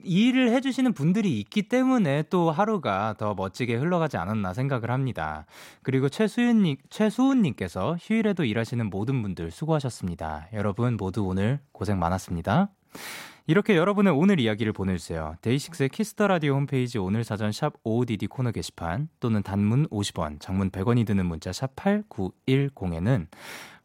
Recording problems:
none

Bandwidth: 16 kHz